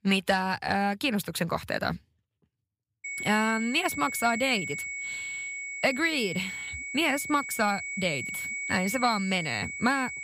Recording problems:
high-pitched whine; loud; from 3 s on; 2 kHz, 6 dB below the speech

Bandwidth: 15.5 kHz